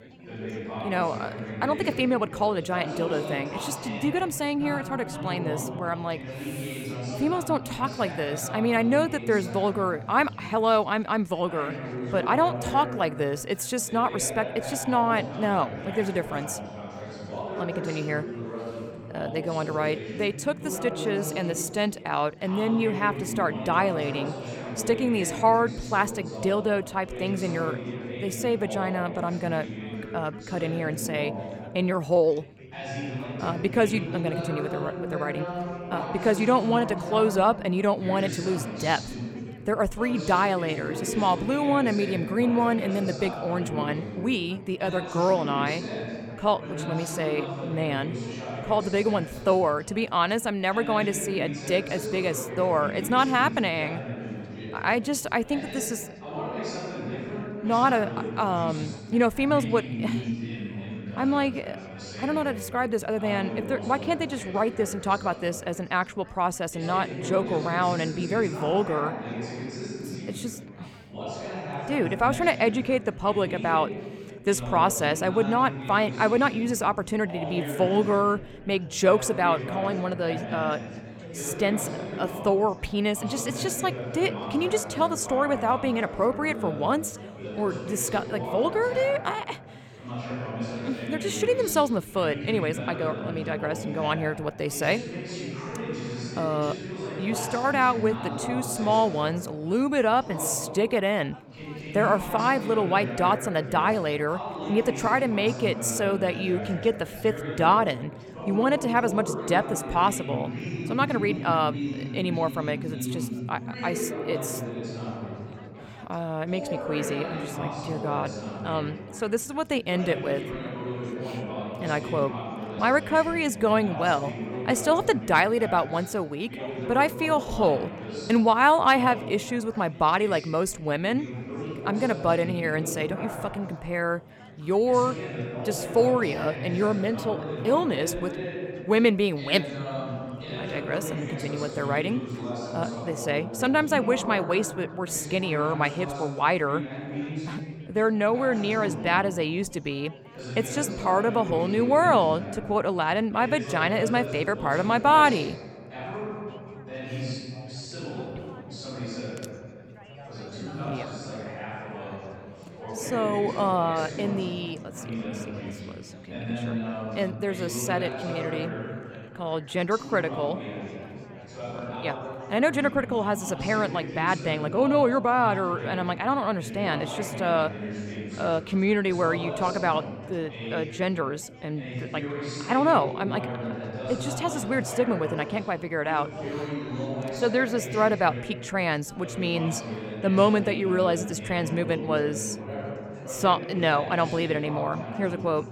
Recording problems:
chatter from many people; loud; throughout; 9 dB below the speech

